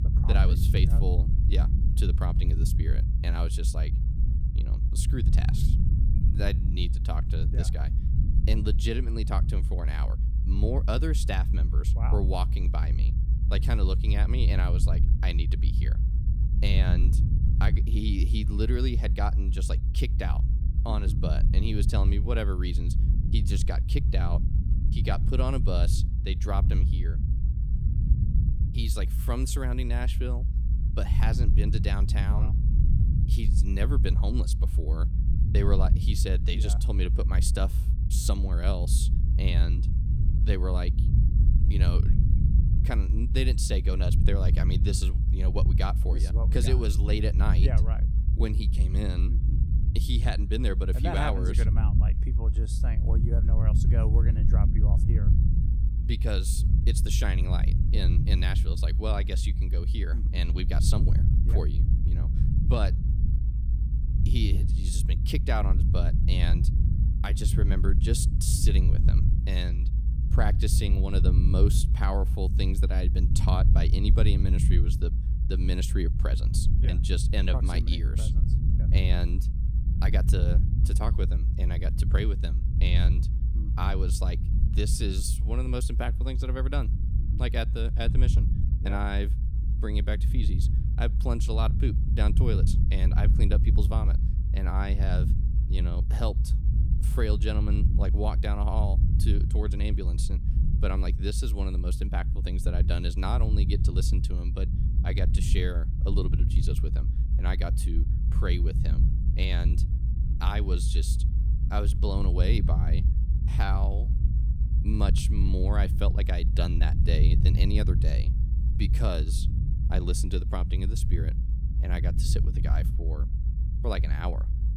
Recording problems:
low rumble; loud; throughout; 6 dB below the speech

